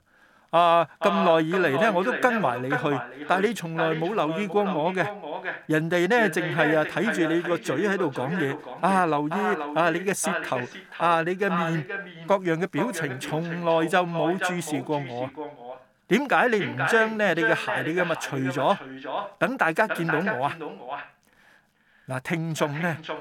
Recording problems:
echo of what is said; strong; throughout; 480 ms later, 7 dB below the speech

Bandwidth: 17.5 kHz